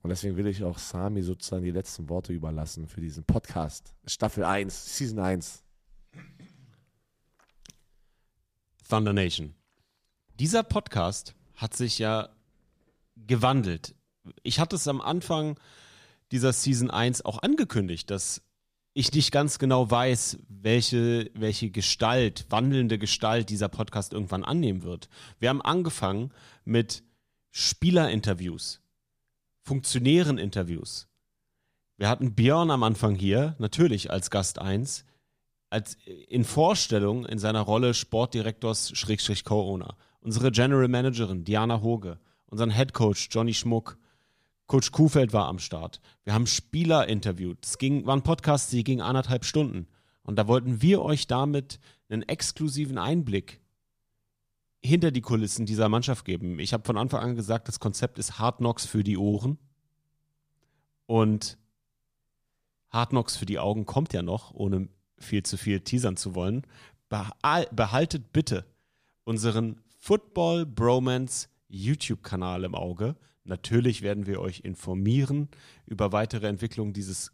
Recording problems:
none

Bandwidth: 14.5 kHz